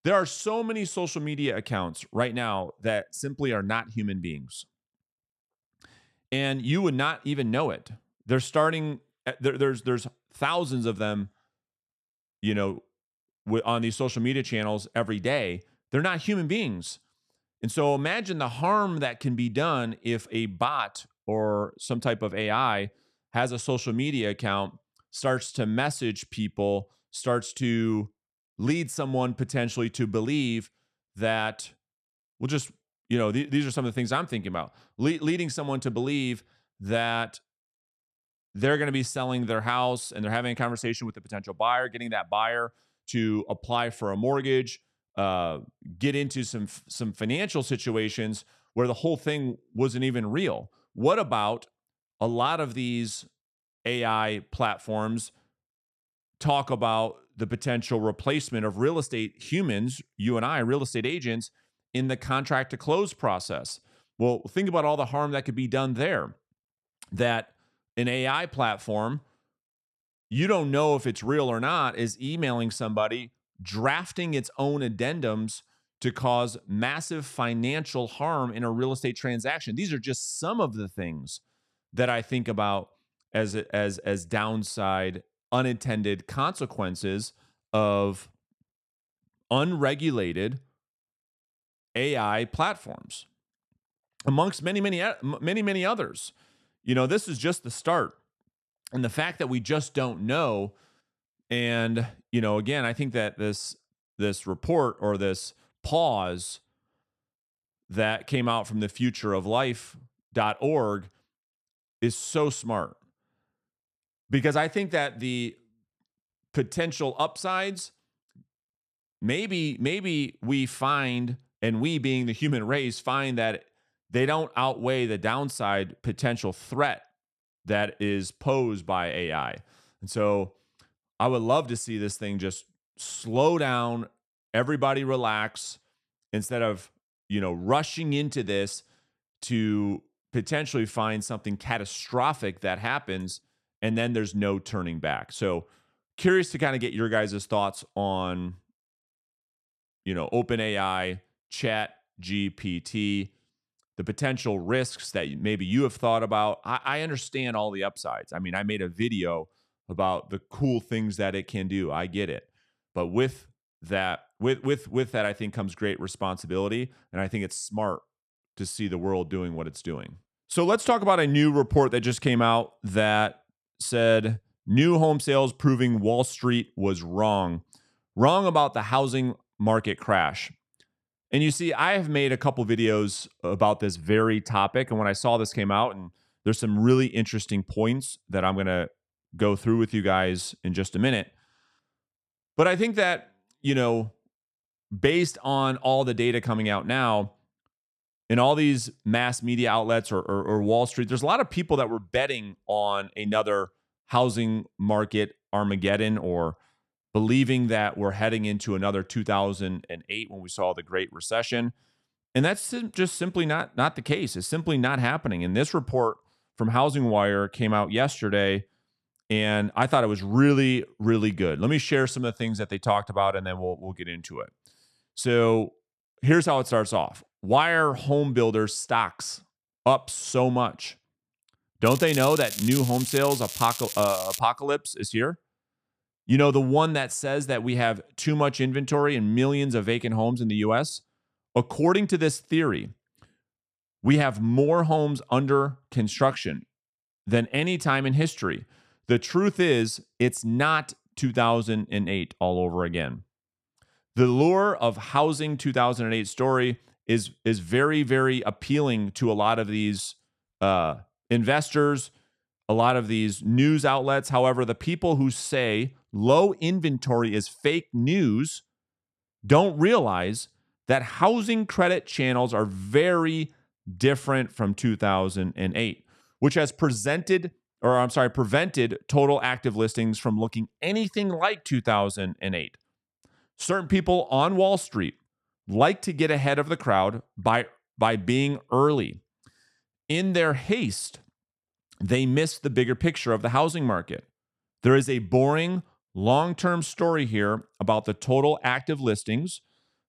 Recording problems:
crackling; loud; from 3:52 to 3:54; 6 dB below the speech

